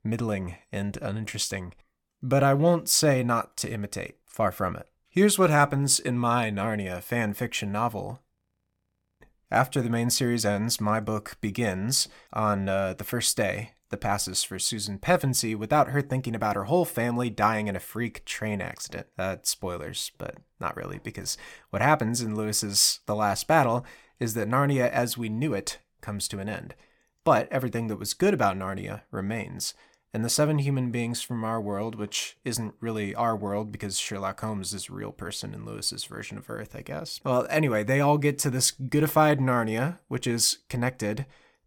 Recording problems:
audio freezing; at 8.5 s for 1 s

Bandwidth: 17.5 kHz